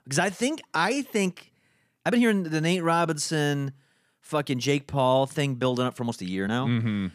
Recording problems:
uneven, jittery; strongly; from 0.5 to 6.5 s

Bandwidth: 14.5 kHz